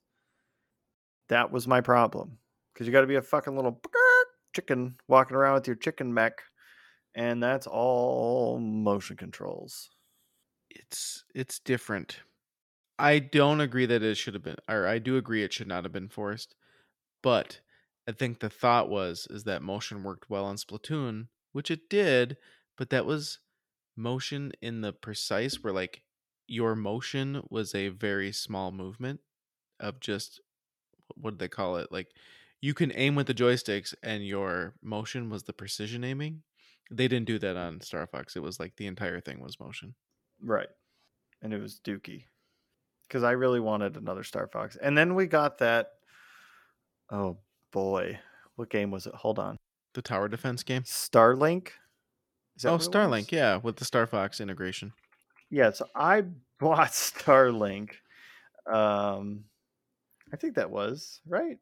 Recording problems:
none

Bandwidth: 17 kHz